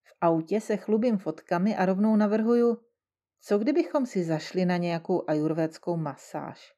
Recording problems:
muffled; slightly; fading above 1.5 kHz

